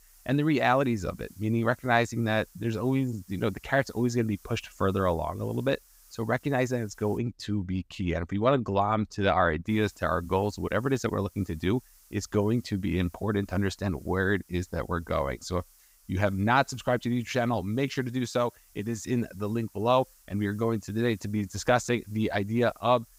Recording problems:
hiss; faint; until 7 s and from 9.5 s on; 30 dB below the speech

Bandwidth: 15.5 kHz